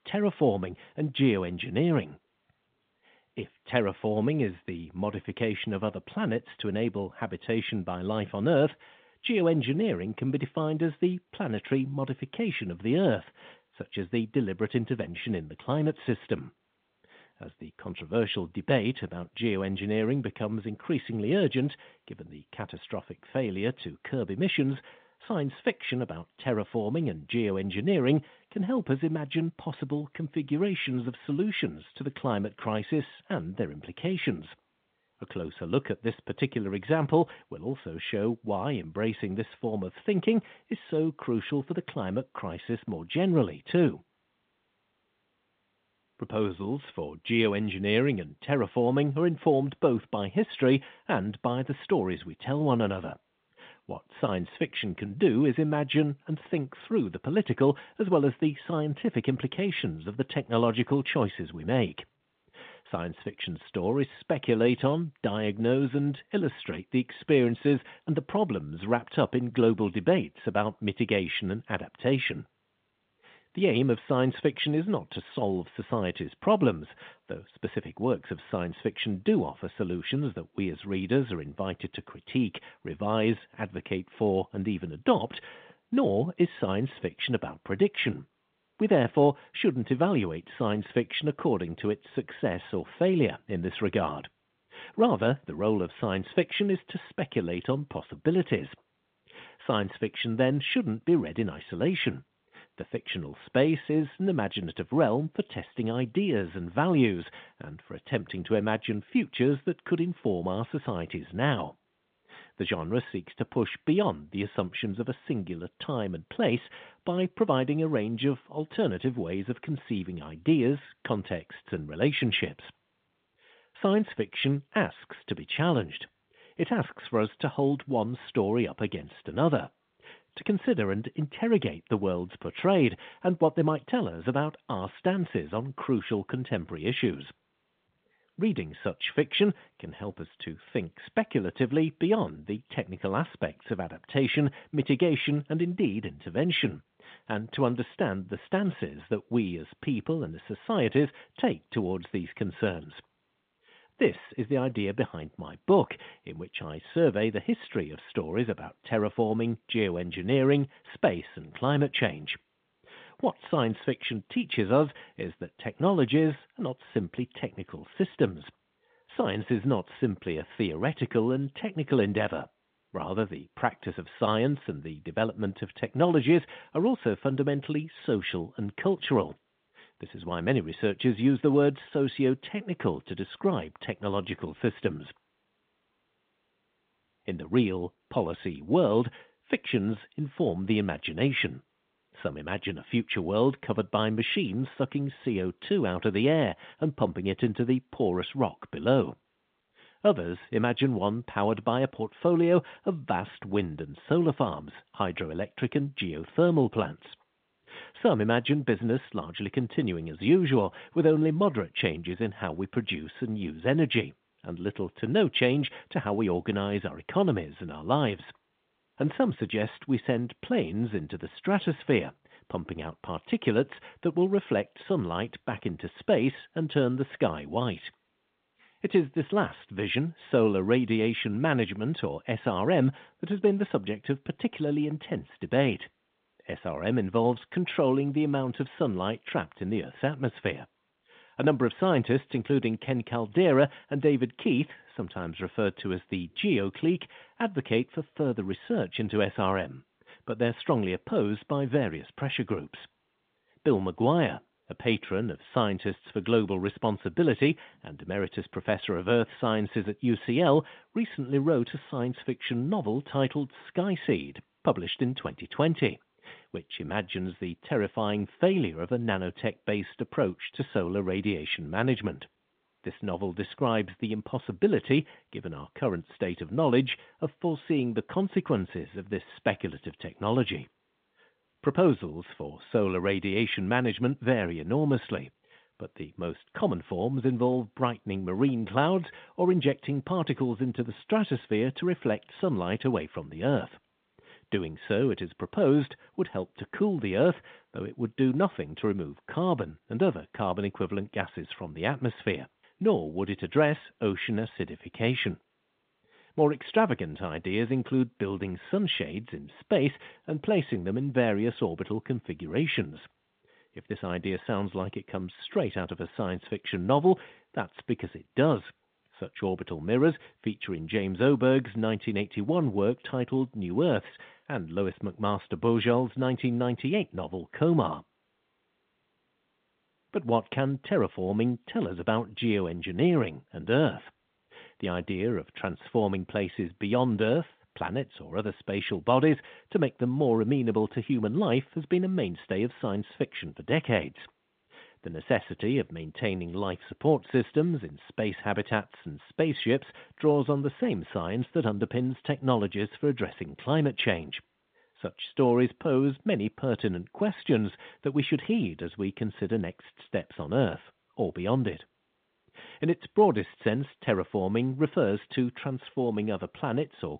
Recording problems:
phone-call audio

